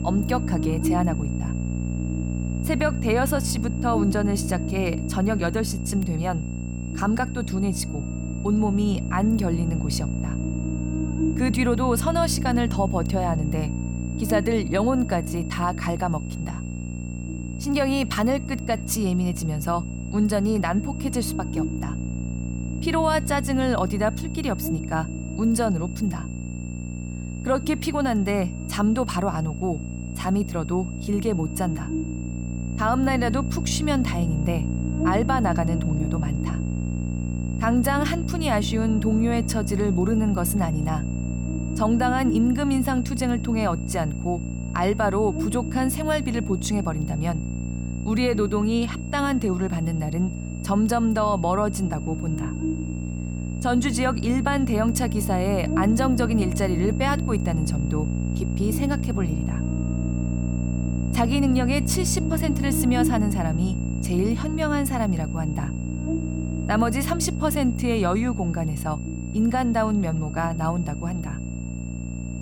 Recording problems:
electrical hum; loud; throughout; 60 Hz, 10 dB below the speech
high-pitched whine; noticeable; throughout; 2.5 kHz, 20 dB below the speech

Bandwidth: 18 kHz